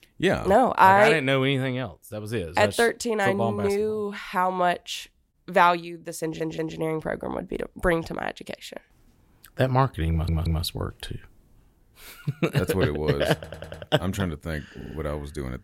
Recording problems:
audio stuttering; 4 times, first at 6 s

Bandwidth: 16 kHz